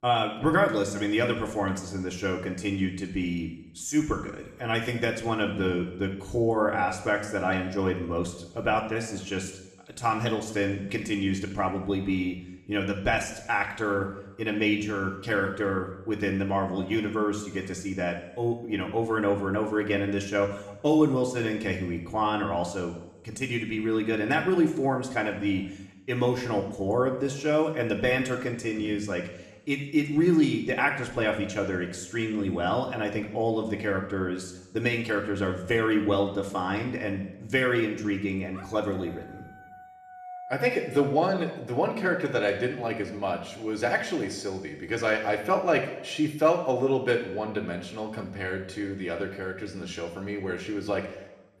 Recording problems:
room echo; slight; dies away in 0.8 s
off-mic speech; somewhat distant
dog barking; faint; from 39 to 42 s; peak 15 dB below the speech

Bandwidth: 13.5 kHz